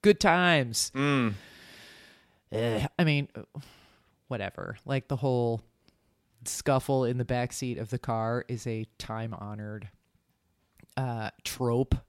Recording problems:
none

